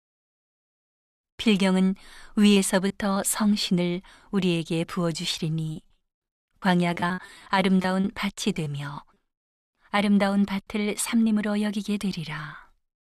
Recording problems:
choppy; very; at 2.5 s and from 5.5 to 8.5 s; 9% of the speech affected

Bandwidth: 14 kHz